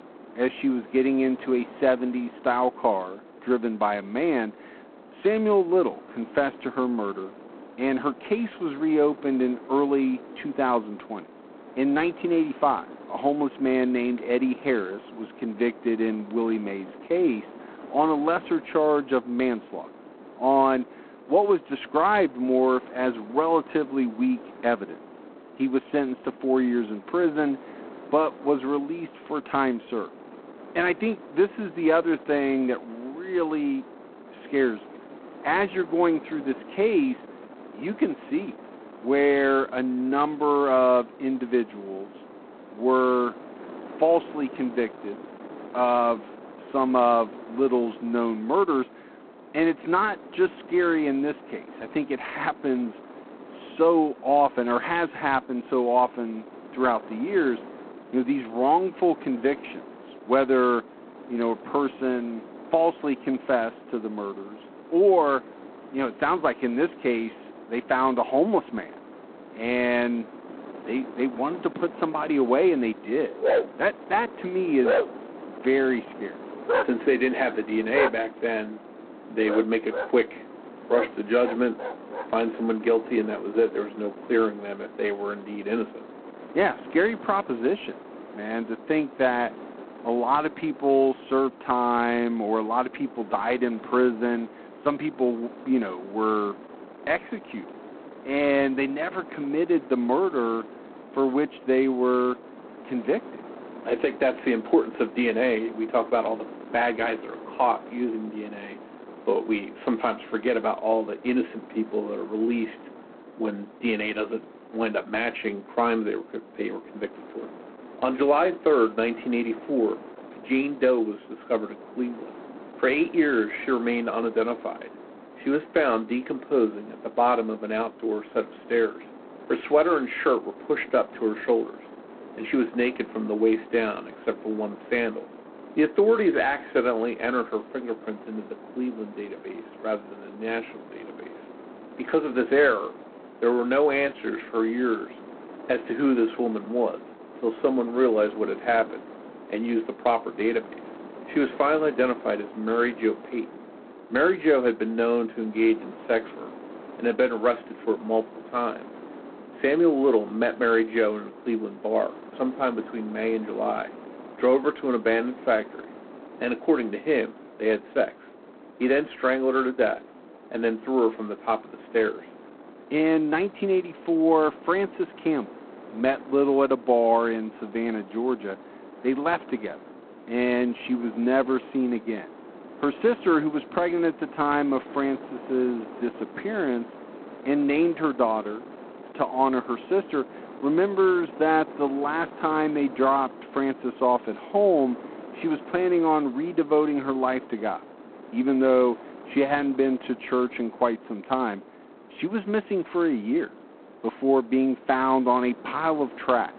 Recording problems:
phone-call audio; poor line; nothing above 4 kHz
muffled; very slightly; fading above 3 kHz
wind noise on the microphone; occasional gusts; 20 dB below the speech
dog barking; loud; from 1:13 to 1:22; peak 2 dB above the speech

